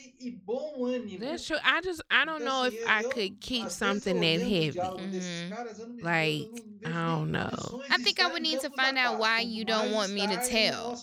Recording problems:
voice in the background; loud; throughout; 9 dB below the speech

